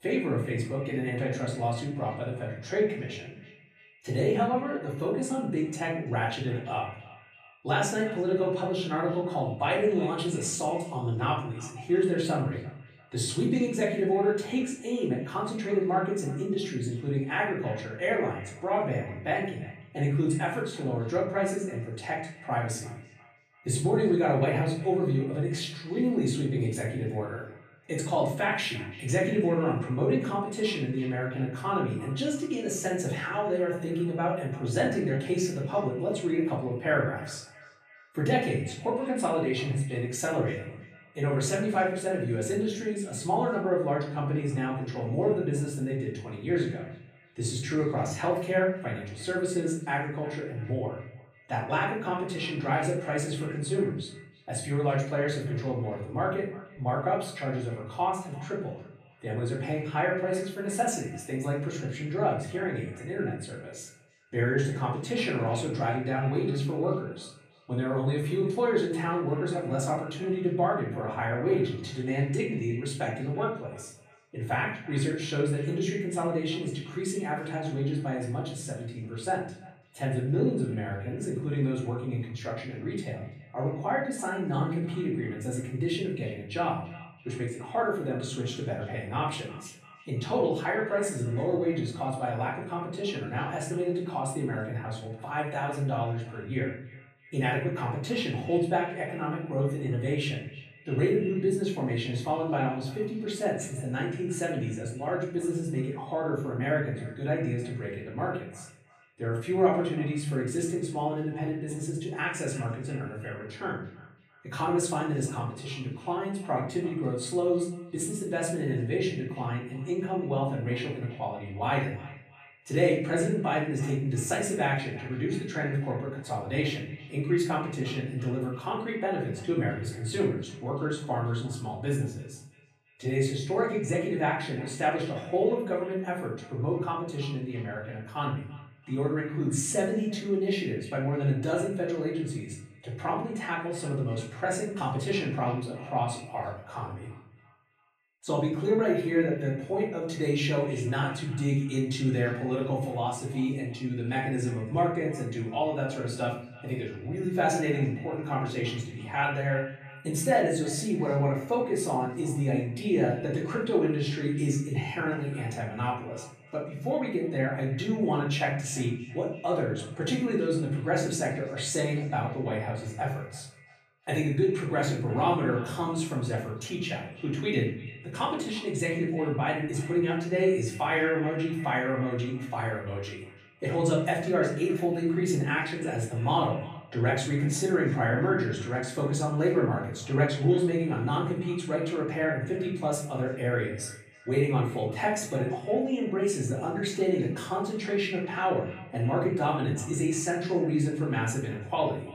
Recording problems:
off-mic speech; far
room echo; noticeable; dies away in 0.5 s
echo of what is said; faint; throughout; 340 ms later, 20 dB below the speech

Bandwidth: 15 kHz